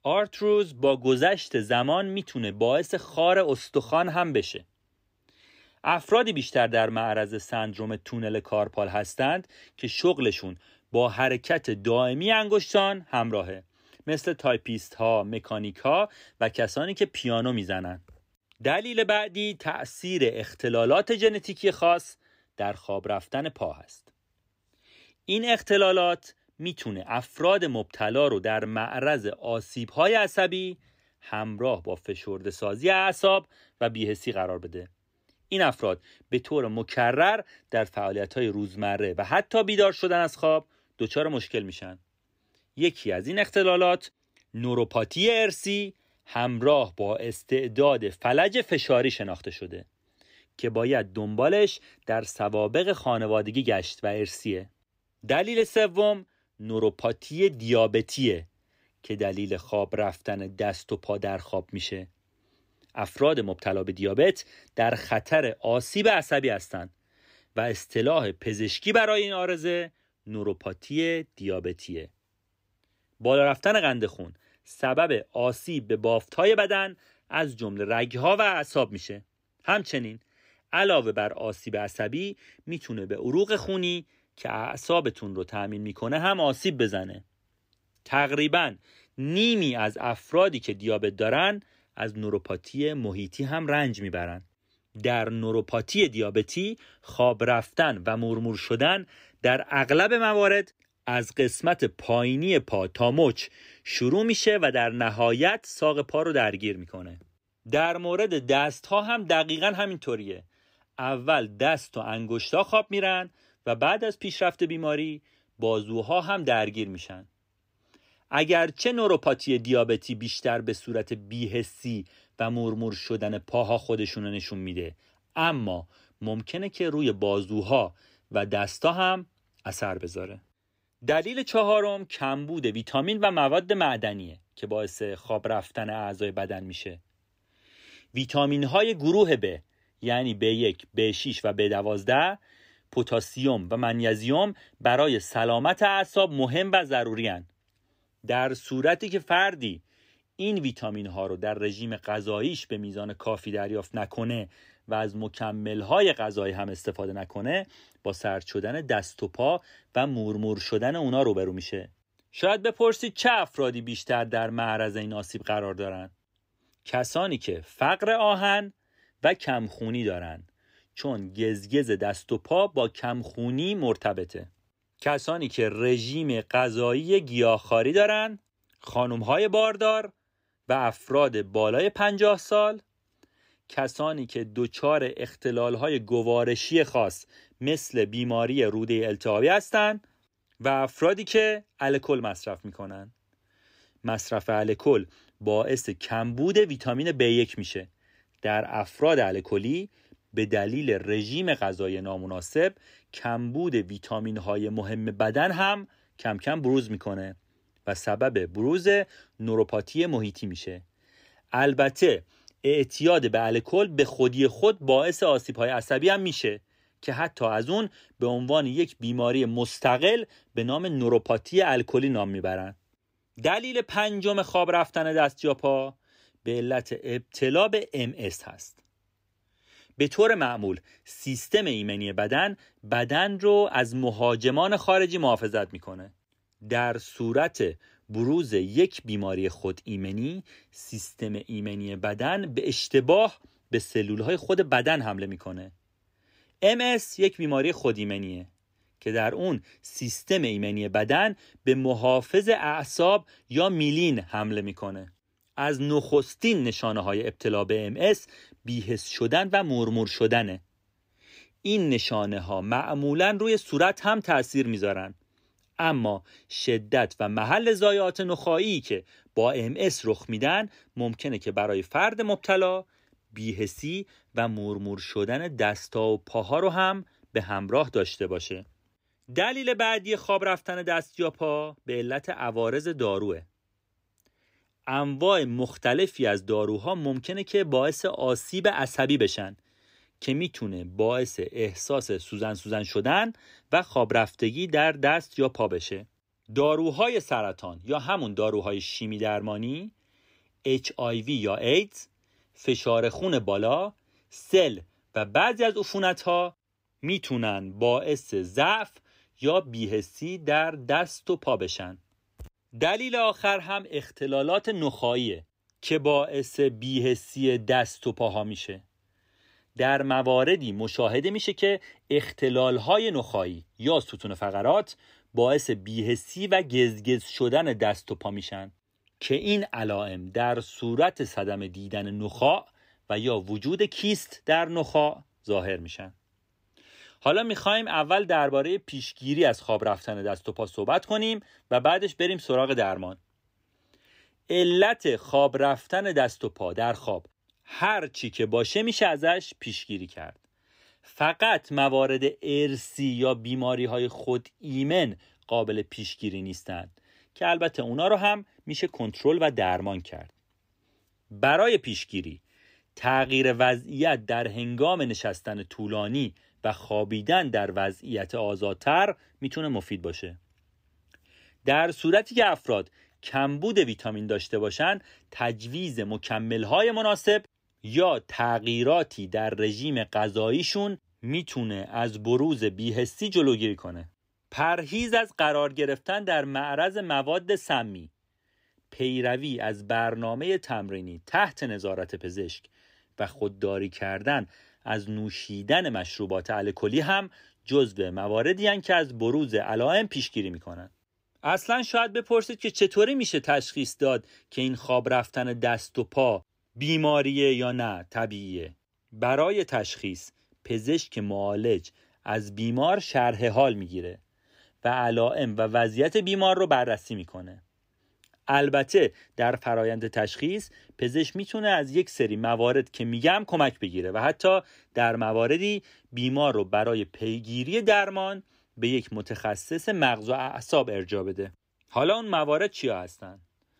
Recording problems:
none

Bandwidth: 15.5 kHz